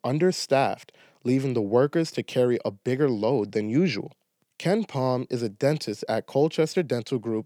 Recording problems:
none

